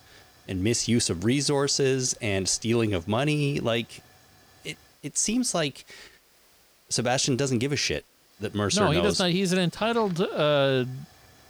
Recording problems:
hiss; faint; throughout; 30 dB below the speech

